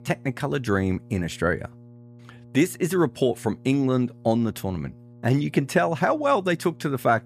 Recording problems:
electrical hum; faint; throughout; 60 Hz, 30 dB below the speech

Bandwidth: 14.5 kHz